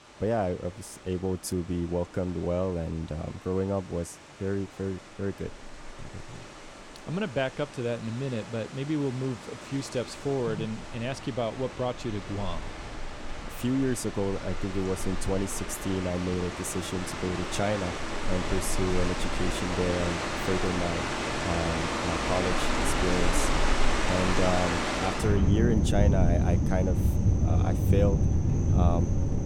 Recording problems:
rain or running water; very loud; throughout; 2 dB above the speech

